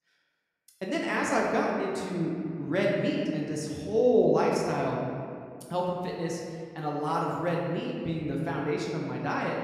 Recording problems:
off-mic speech; far
room echo; noticeable; dies away in 1.9 s

